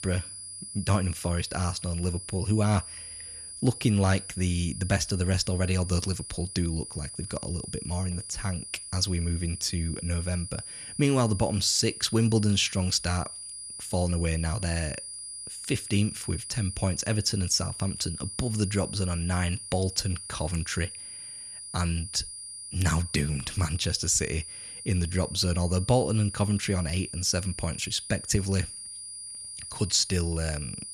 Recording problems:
high-pitched whine; loud; throughout; 9.5 kHz, 9 dB below the speech

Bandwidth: 14 kHz